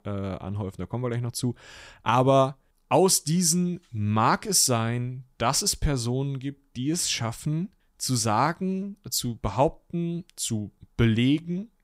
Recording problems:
none

